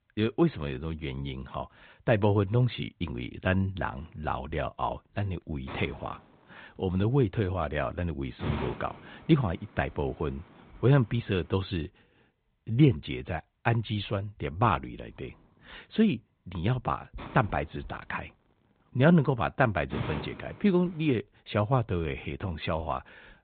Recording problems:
high frequencies cut off; severe; nothing above 4 kHz
hiss; noticeable; from 4 to 12 s and from 15 to 21 s; 15 dB below the speech

